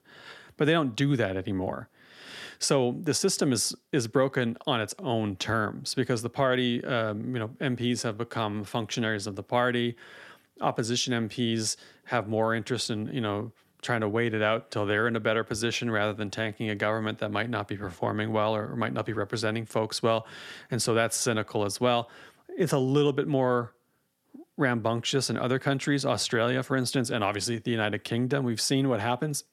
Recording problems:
none

